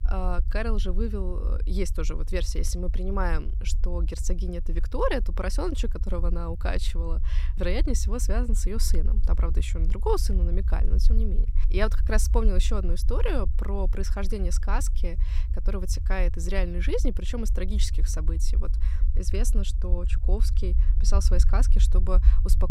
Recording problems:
low rumble; noticeable; throughout; 15 dB below the speech

